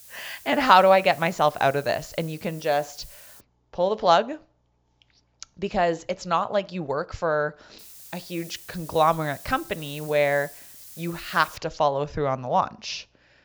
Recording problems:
high frequencies cut off; noticeable; nothing above 7.5 kHz
hiss; noticeable; until 3.5 s and from 8 to 12 s; 20 dB below the speech

